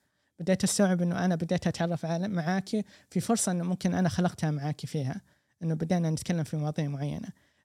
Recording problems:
none

